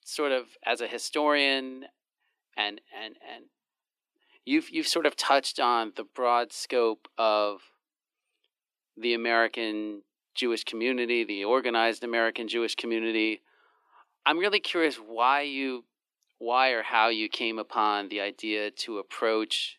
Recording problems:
thin; somewhat; fading below 300 Hz

